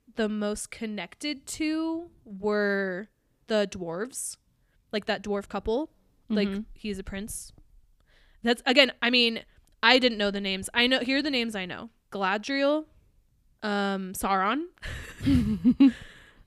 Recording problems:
uneven, jittery; strongly; from 1.5 to 9 s

